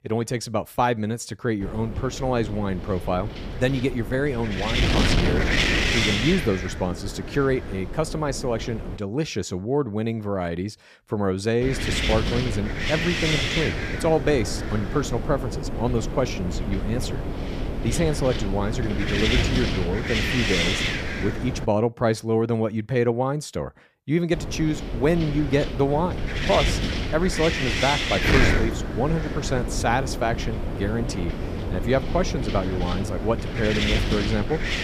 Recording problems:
wind noise on the microphone; heavy; from 1.5 to 9 s, from 12 to 22 s and from 24 s on; as loud as the speech

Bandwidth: 14.5 kHz